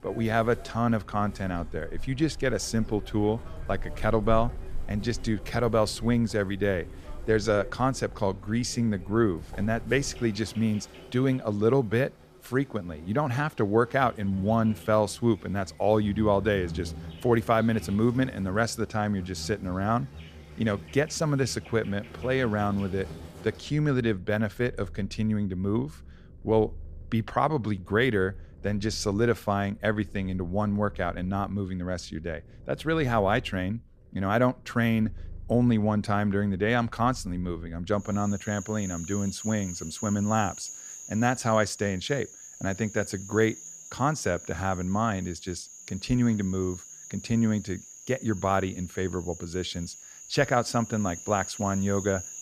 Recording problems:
animal sounds; noticeable; throughout; 15 dB below the speech

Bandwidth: 15 kHz